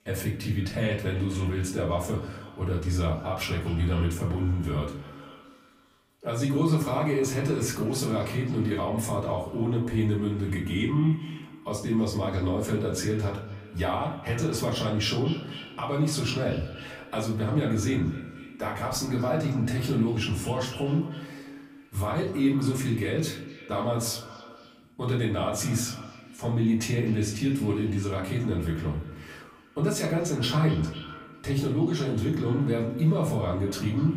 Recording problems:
off-mic speech; far
echo of what is said; noticeable; throughout; 250 ms later, 15 dB below the speech
room echo; slight; dies away in 0.4 s

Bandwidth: 15.5 kHz